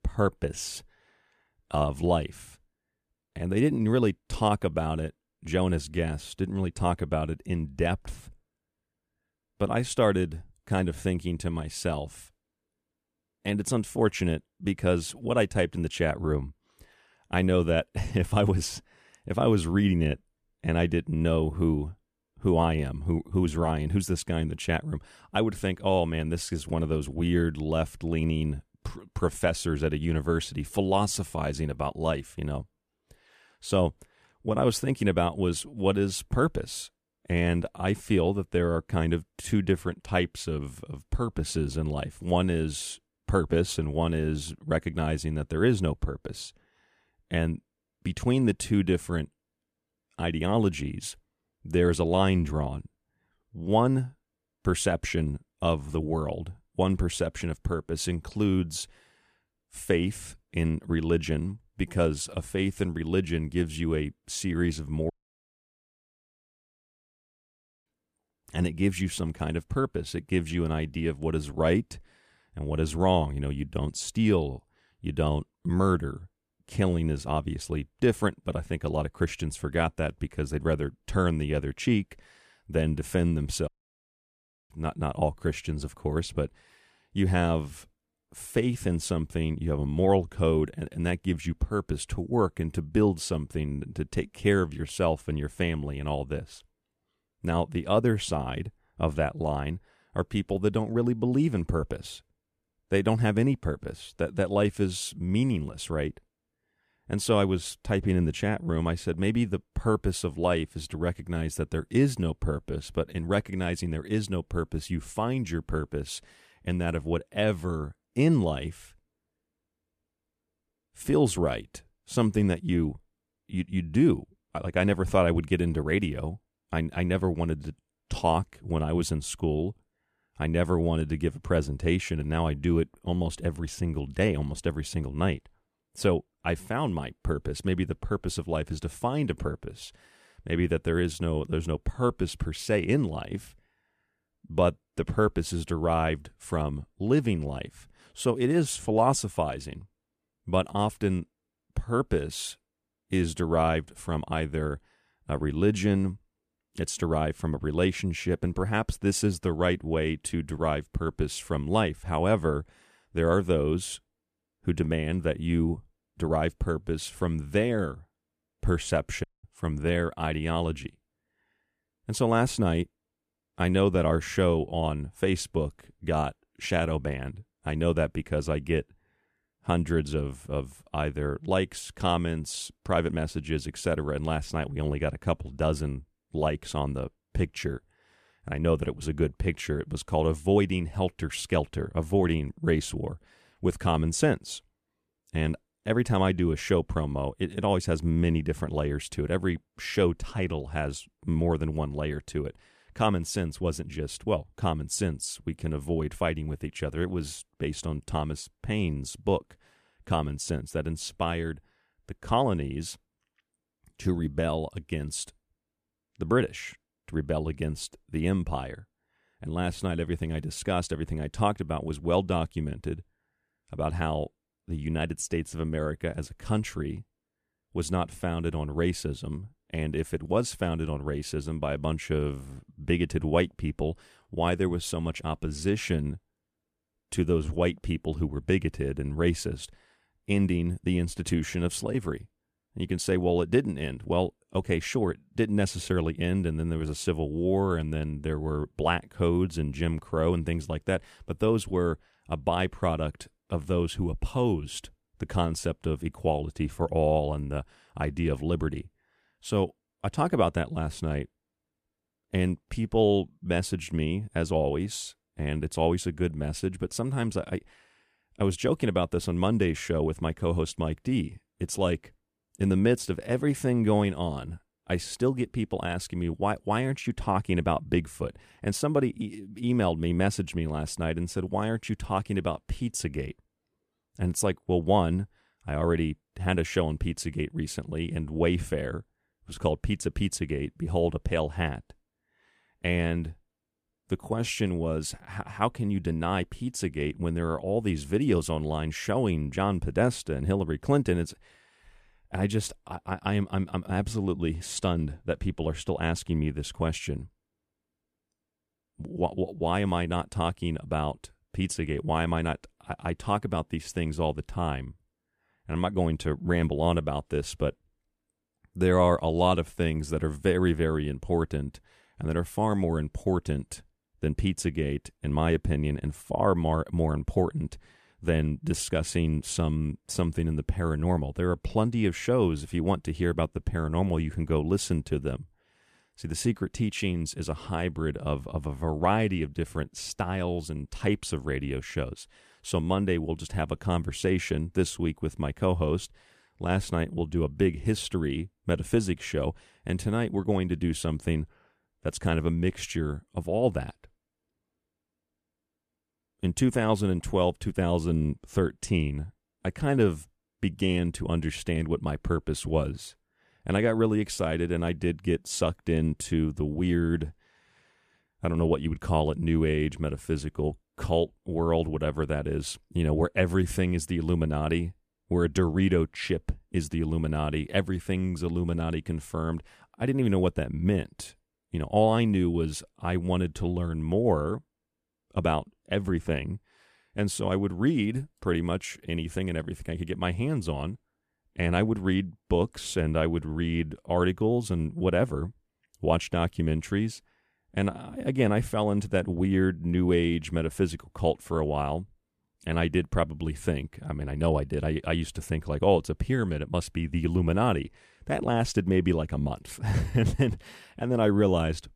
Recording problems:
audio cutting out; at 1:05 for 3 s, at 1:24 for 1 s and at 2:49

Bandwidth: 14.5 kHz